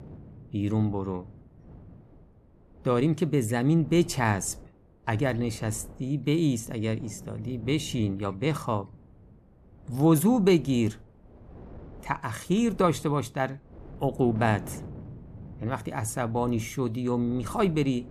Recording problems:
wind noise on the microphone; occasional gusts; 25 dB below the speech

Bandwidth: 13.5 kHz